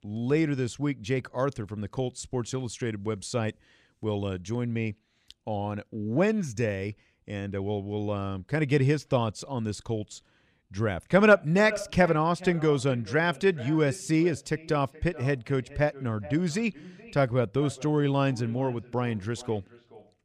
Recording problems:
echo of what is said; noticeable; from 11 s on; 420 ms later, 15 dB below the speech

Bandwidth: 15 kHz